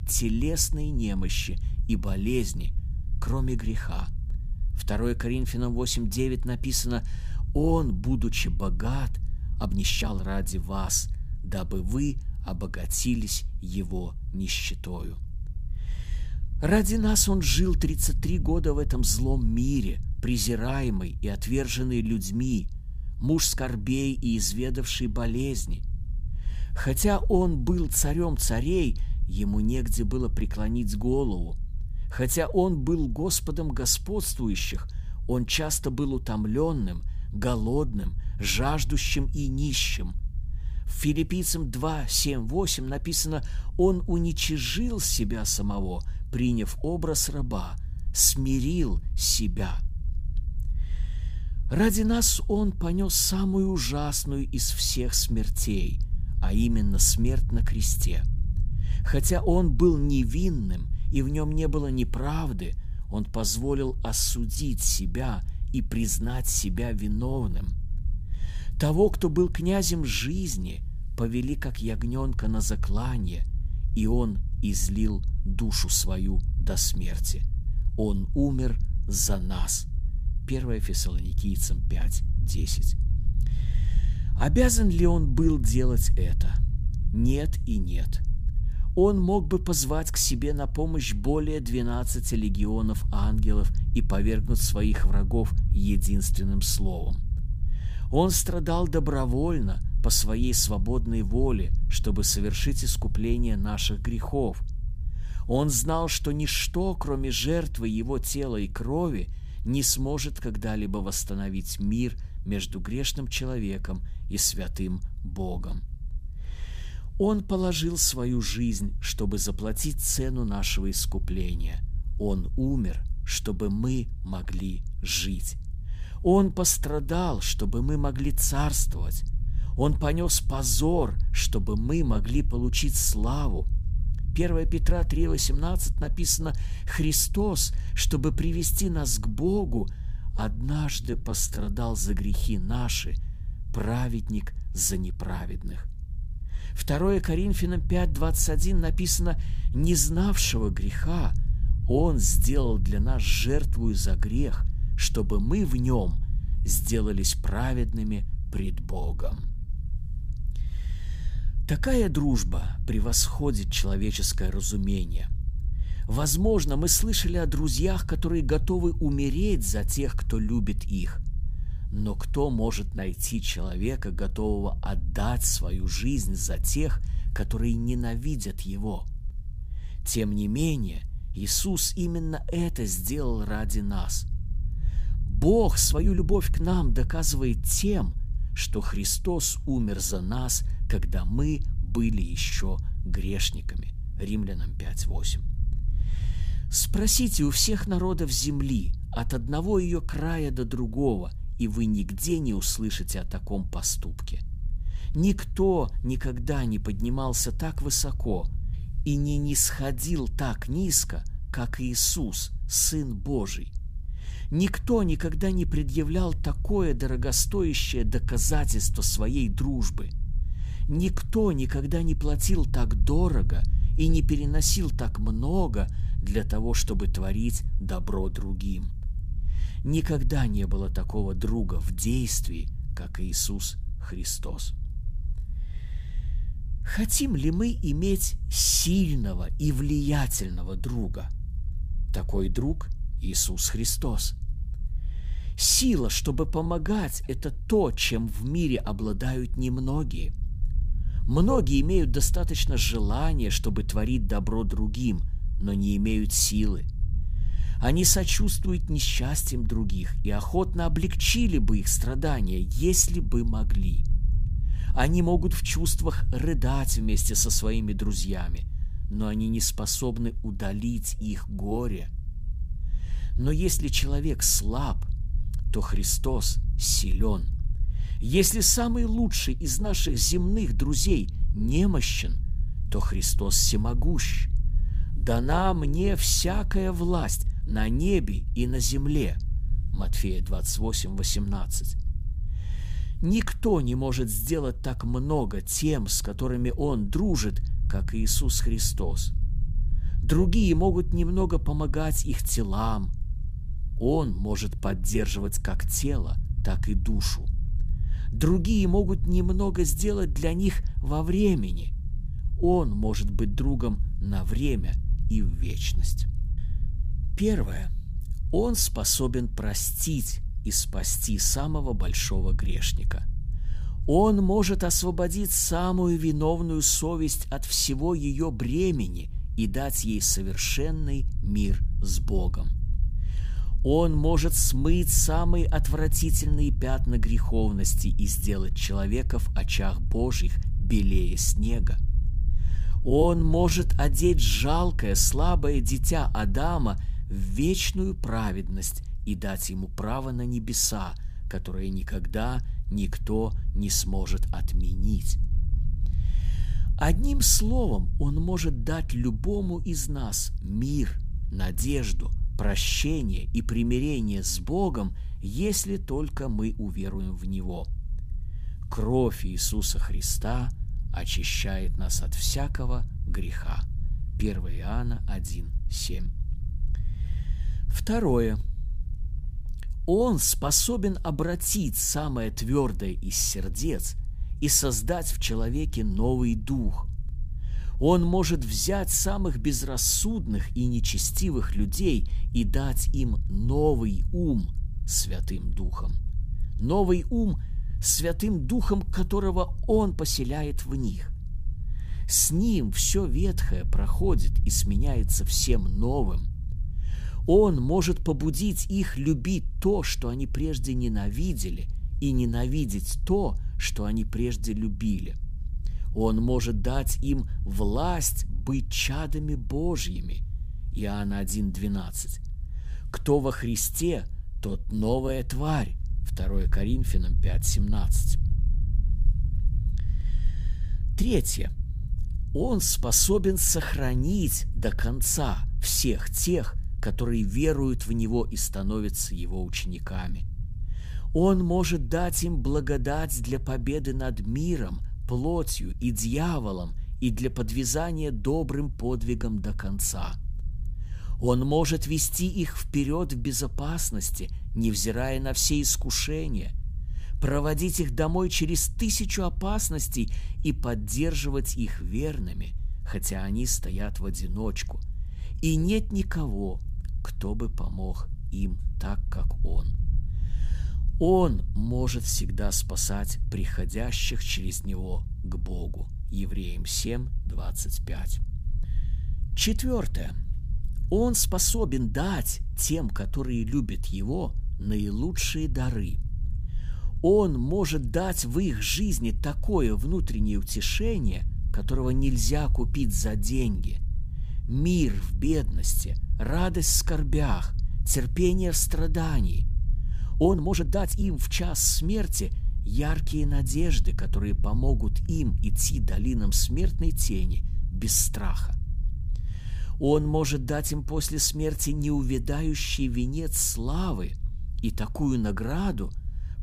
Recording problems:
low rumble; faint; throughout; 20 dB below the speech
uneven, jittery; strongly; from 9.5 s to 8:21

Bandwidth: 15 kHz